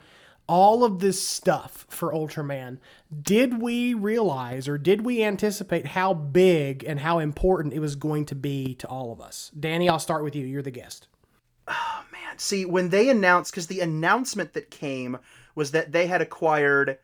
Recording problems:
none

